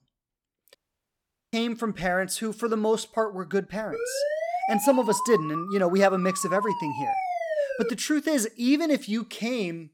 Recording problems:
audio cutting out; at 1 s for 1 s
siren; noticeable; from 4 to 8 s; peak 2 dB below the speech

